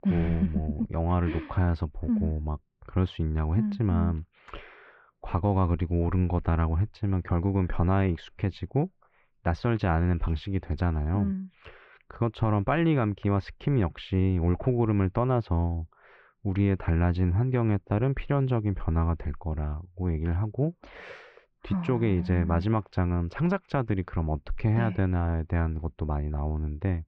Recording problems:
muffled; very; fading above 2.5 kHz

